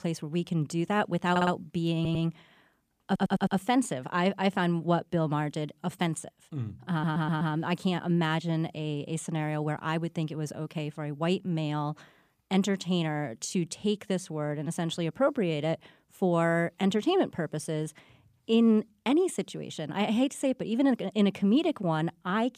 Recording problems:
audio stuttering; 4 times, first at 1.5 s

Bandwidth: 15 kHz